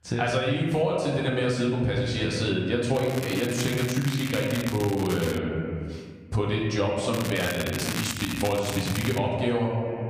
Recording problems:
off-mic speech; far
room echo; noticeable; dies away in 1.2 s
squashed, flat; somewhat
crackling; loud; from 3 to 5.5 s and from 7 to 9 s; 9 dB below the speech

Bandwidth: 15 kHz